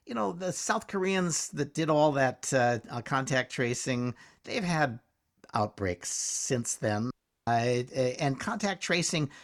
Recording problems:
audio cutting out; at 7 s

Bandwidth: 18.5 kHz